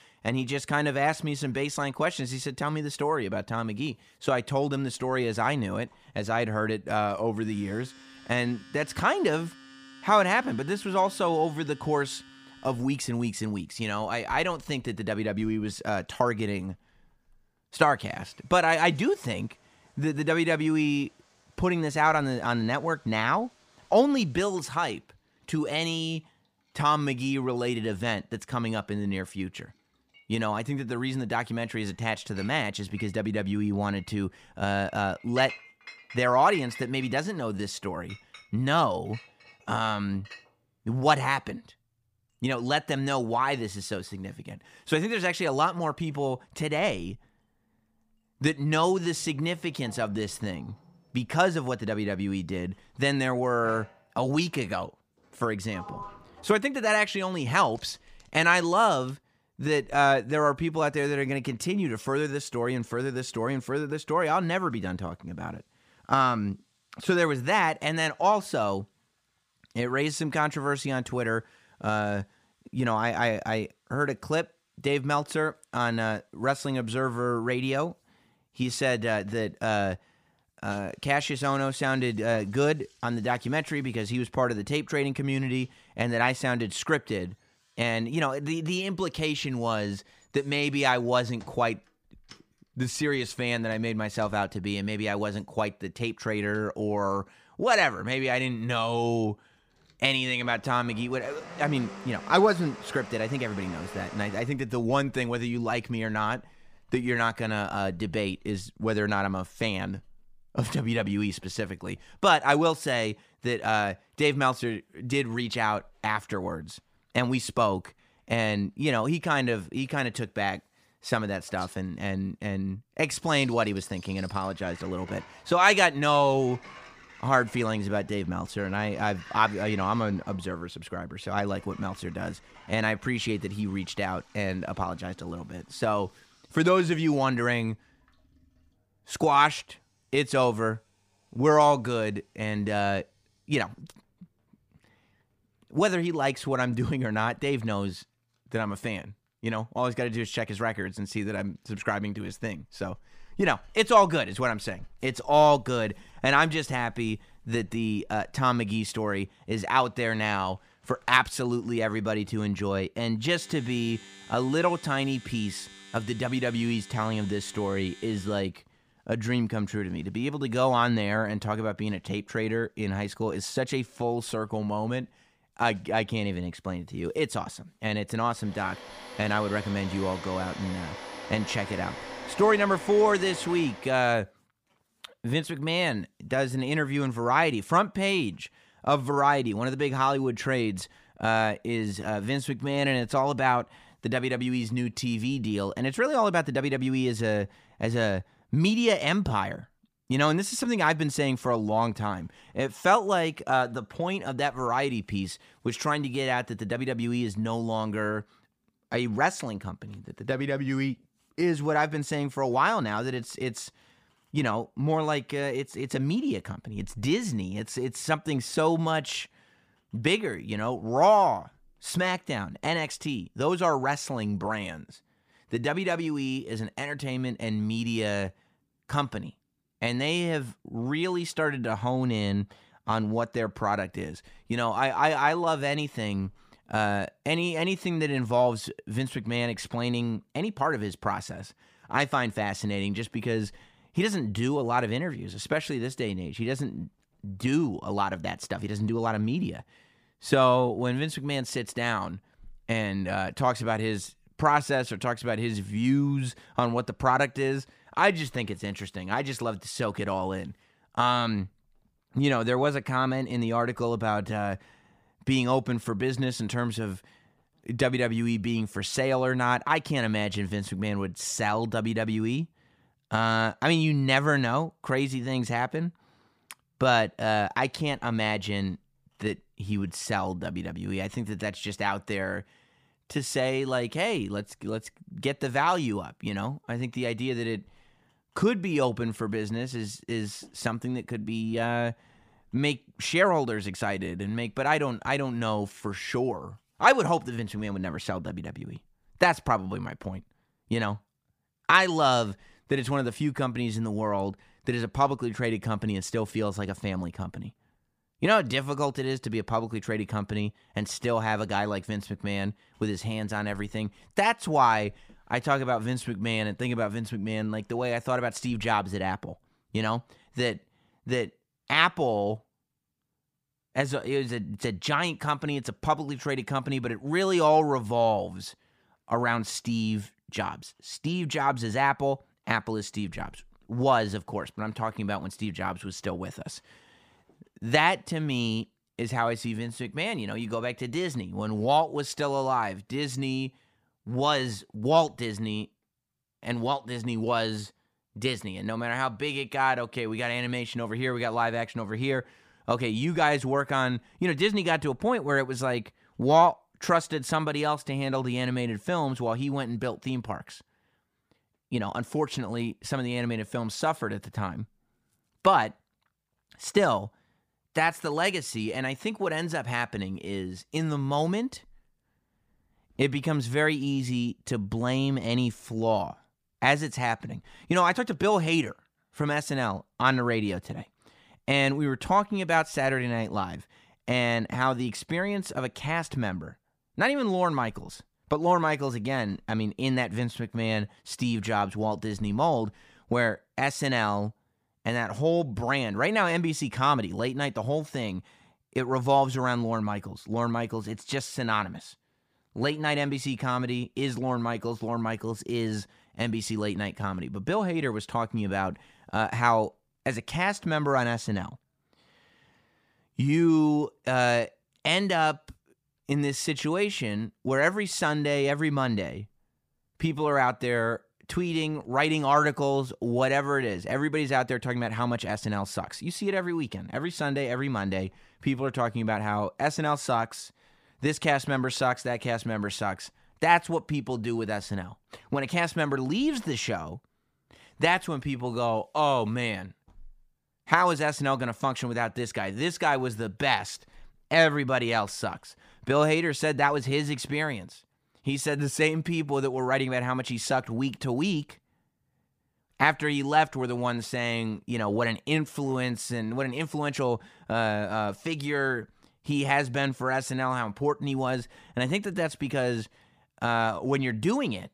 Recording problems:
household noises; noticeable; until 3:04; 20 dB below the speech

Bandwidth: 15 kHz